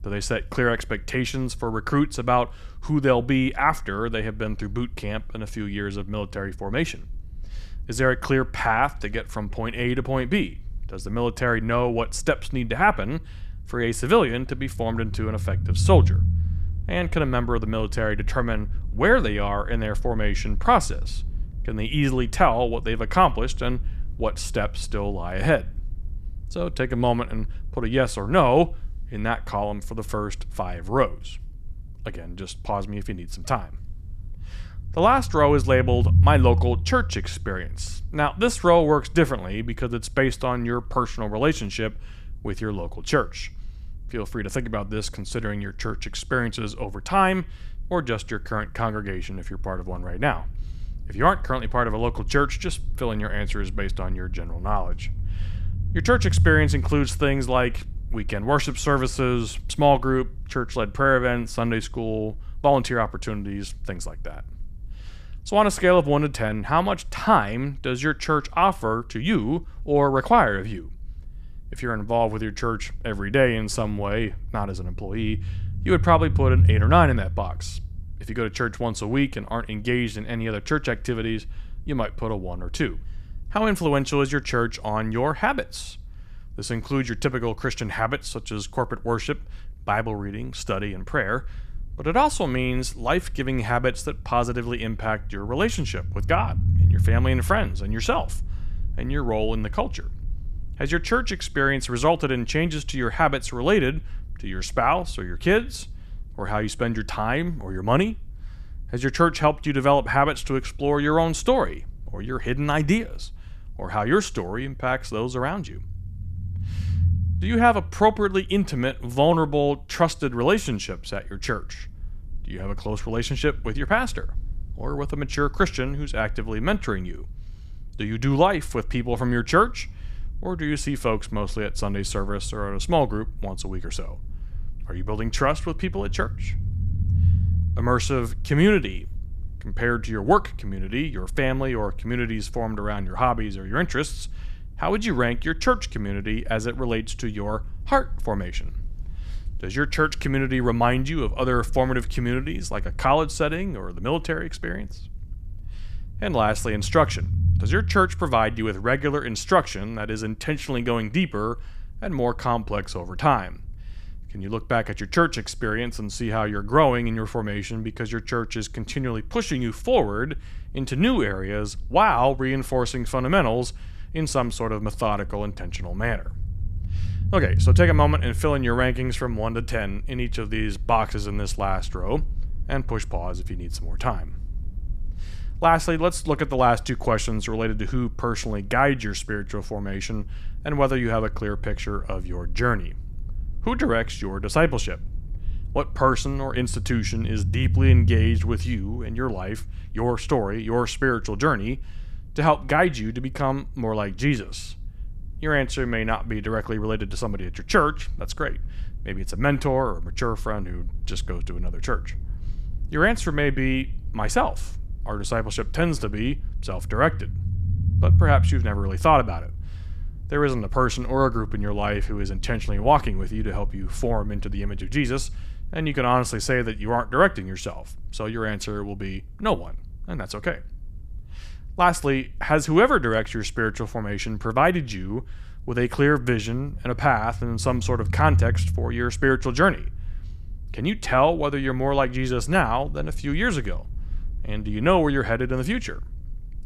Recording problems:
low rumble; faint; throughout; 25 dB below the speech

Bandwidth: 14.5 kHz